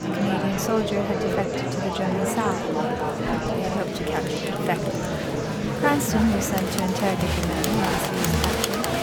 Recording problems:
murmuring crowd; very loud; throughout; 2 dB above the speech

